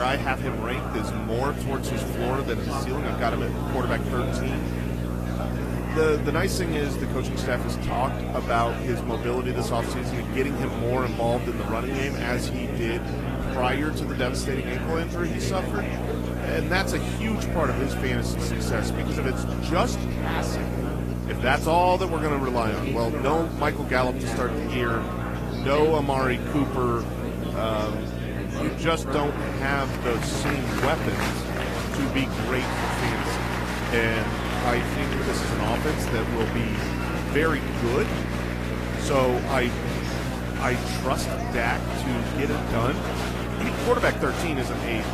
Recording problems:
garbled, watery; slightly; nothing above 14.5 kHz
murmuring crowd; loud; throughout; 4 dB below the speech
electrical hum; noticeable; throughout; 60 Hz, 10 dB below the speech
hiss; faint; throughout; 20 dB below the speech
abrupt cut into speech; at the start

